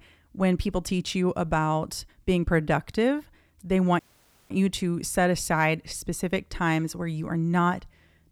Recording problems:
audio cutting out; at 4 s for 0.5 s

